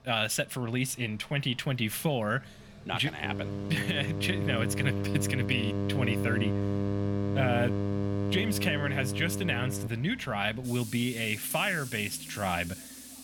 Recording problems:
electrical hum; loud; from 3 to 10 s; 50 Hz, 6 dB below the speech
machinery noise; noticeable; throughout; 15 dB below the speech

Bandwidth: 18 kHz